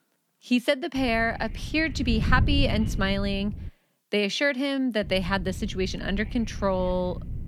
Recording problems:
wind noise on the microphone; occasional gusts; from 1 to 3.5 s and from 5 s on; 20 dB below the speech

